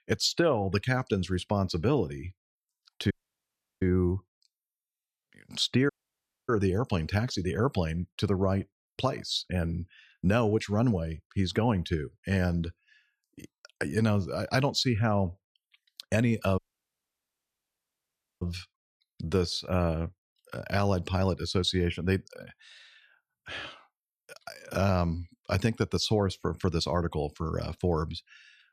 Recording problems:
audio cutting out; at 3 s for 0.5 s, at 6 s for 0.5 s and at 17 s for 2 s

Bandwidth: 14.5 kHz